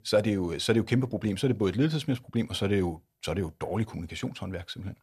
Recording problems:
none

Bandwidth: 13.5 kHz